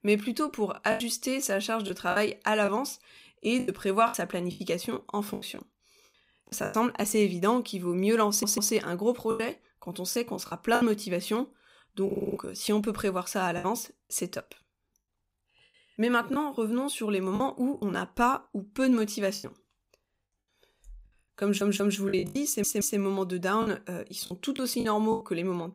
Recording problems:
choppy; very; 8% of the speech affected
audio stuttering; 4 times, first at 8.5 s

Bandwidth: 15.5 kHz